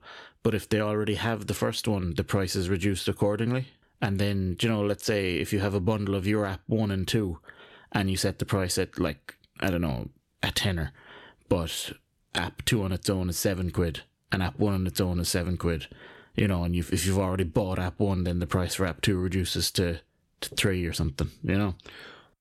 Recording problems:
none

